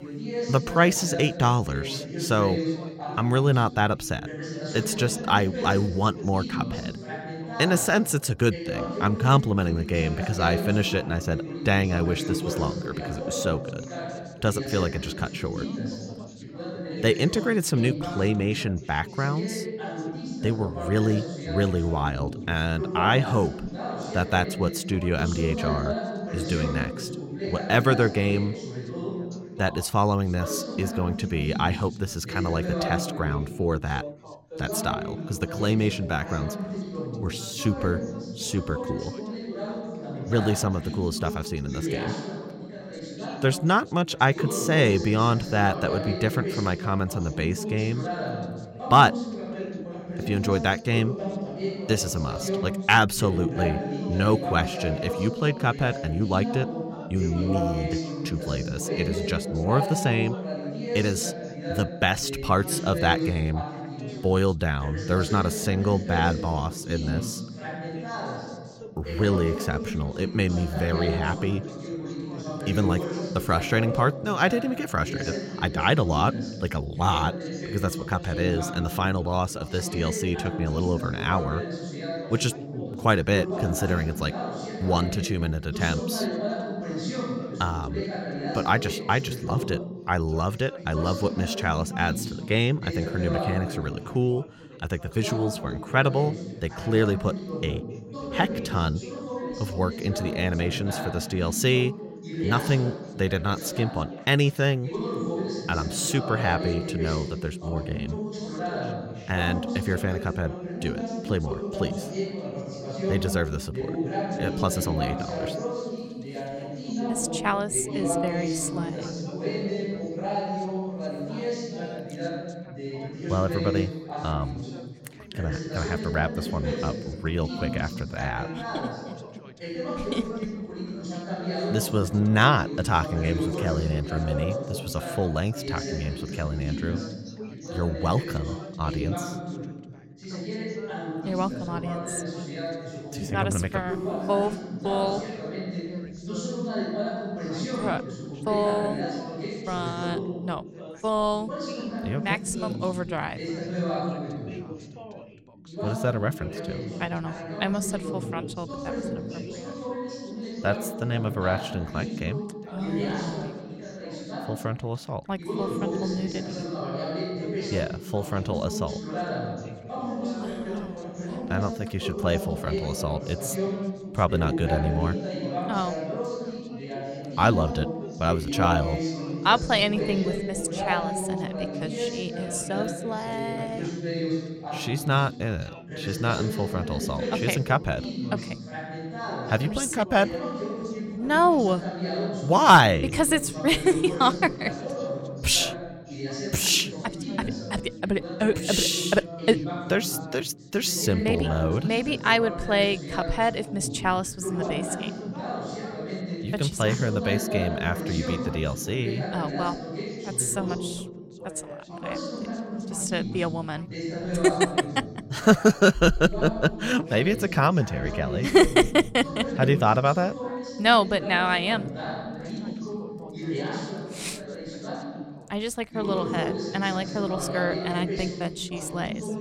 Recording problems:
background chatter; loud; throughout; 3 voices, 7 dB below the speech

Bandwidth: 16 kHz